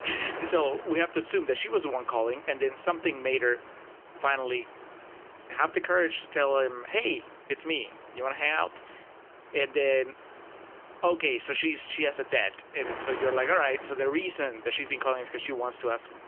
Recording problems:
phone-call audio; nothing above 3 kHz
wind noise on the microphone; occasional gusts; 15 dB below the speech

